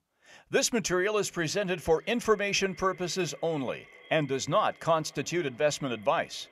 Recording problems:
echo of what is said; faint; throughout; 480 ms later, 25 dB below the speech

